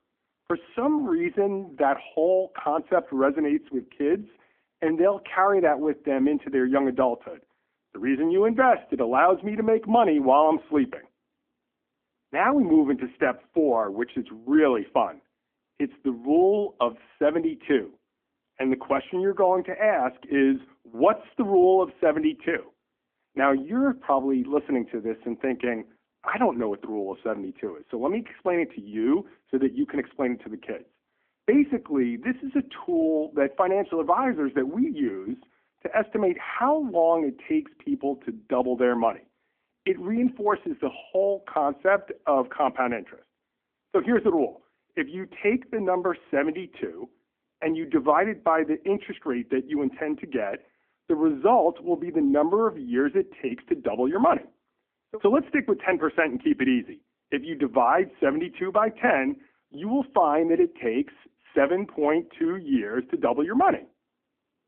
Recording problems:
phone-call audio; nothing above 3 kHz

